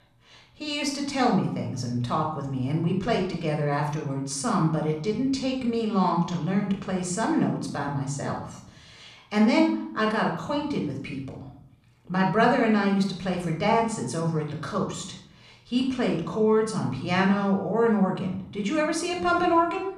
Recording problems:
room echo; noticeable; dies away in 0.6 s
off-mic speech; somewhat distant

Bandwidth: 14.5 kHz